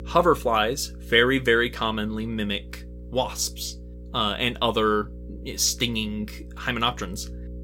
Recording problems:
electrical hum; faint; throughout; 60 Hz, 25 dB below the speech

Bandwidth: 16.5 kHz